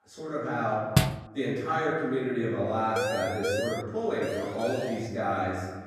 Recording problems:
room echo; strong; dies away in 1.3 s
off-mic speech; far
door banging; loud; at 1 s; peak 4 dB above the speech
siren; loud; at 3 s; peak level with the speech
siren; noticeable; at 4 s; peak 5 dB below the speech

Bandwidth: 14.5 kHz